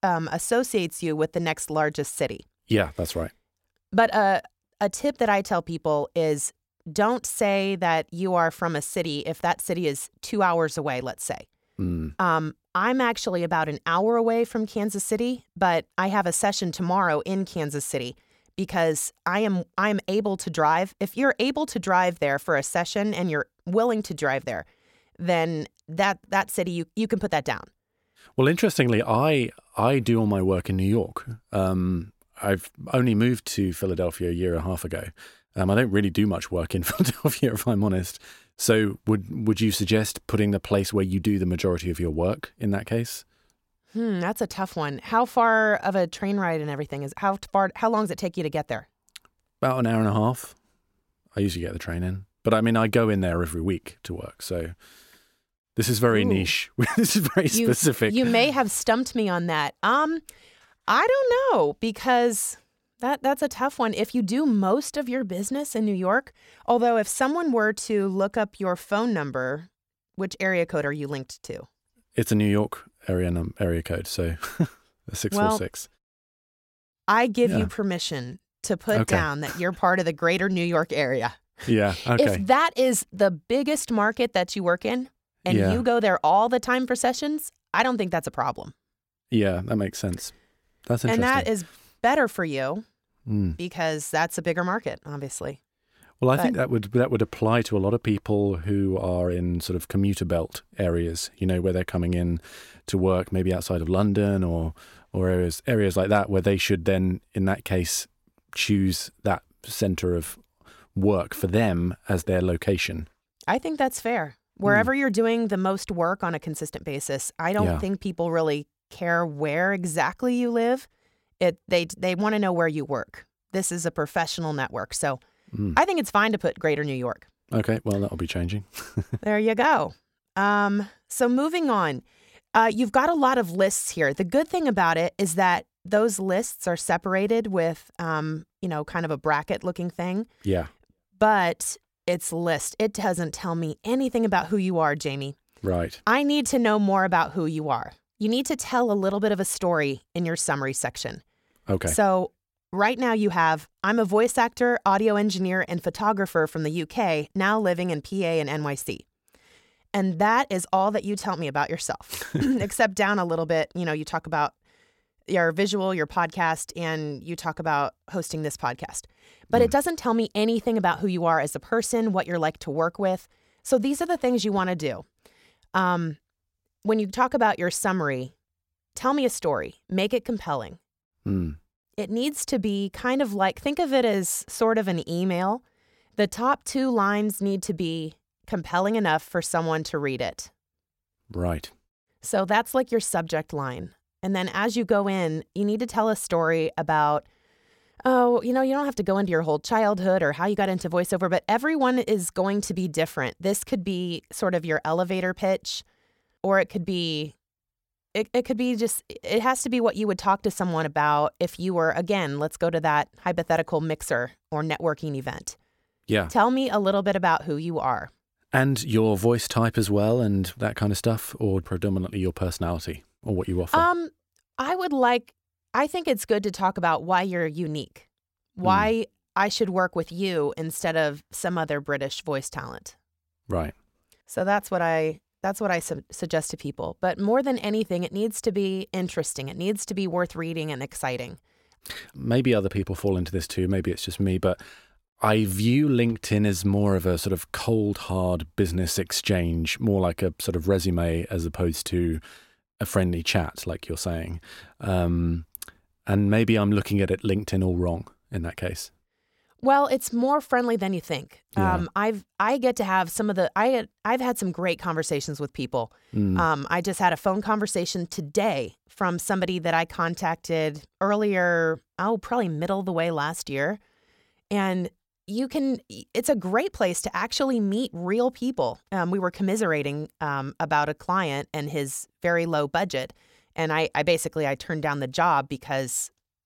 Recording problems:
none

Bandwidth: 16.5 kHz